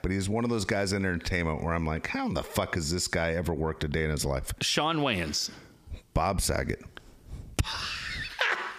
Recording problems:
squashed, flat; heavily

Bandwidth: 15 kHz